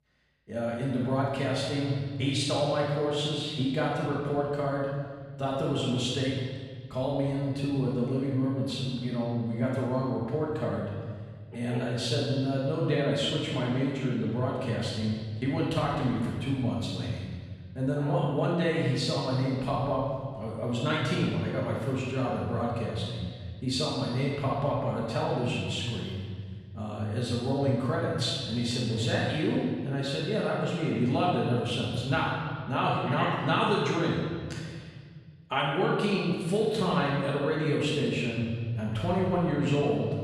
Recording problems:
room echo; strong; dies away in 1.7 s
off-mic speech; far

